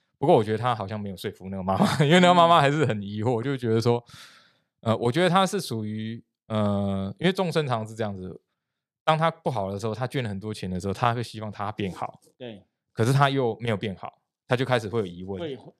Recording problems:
none

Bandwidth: 14.5 kHz